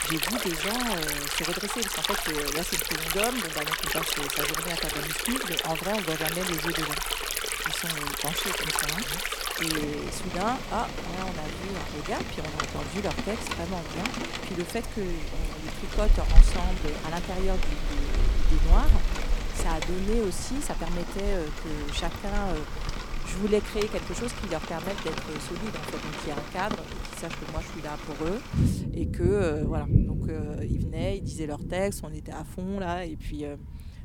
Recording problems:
rain or running water; very loud; throughout; 3 dB above the speech

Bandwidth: 17 kHz